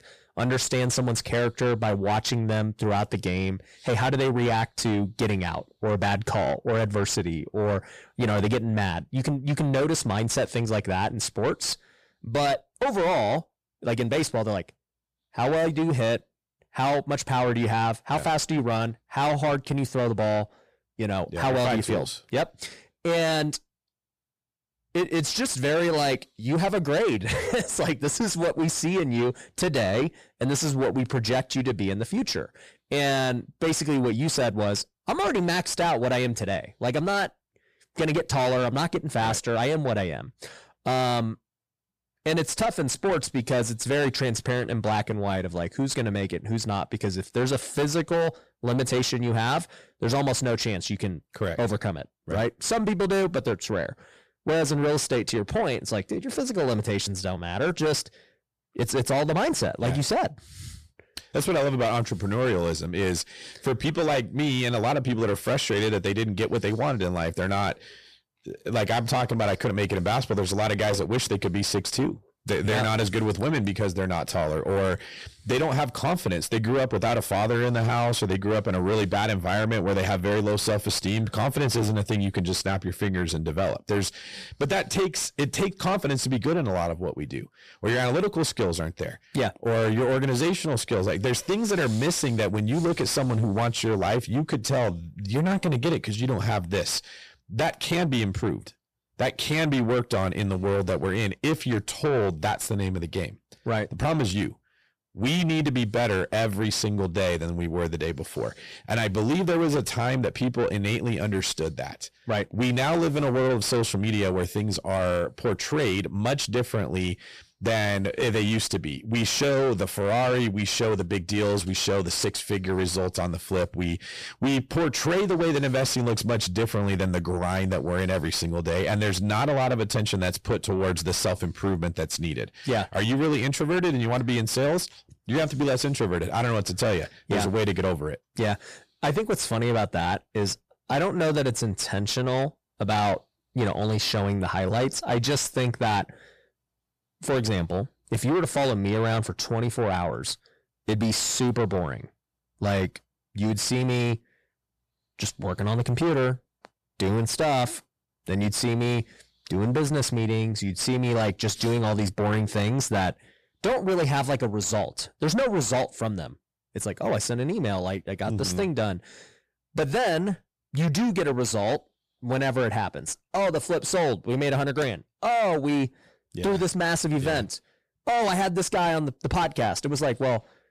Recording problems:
distortion; heavy; 7 dB below the speech

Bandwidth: 14.5 kHz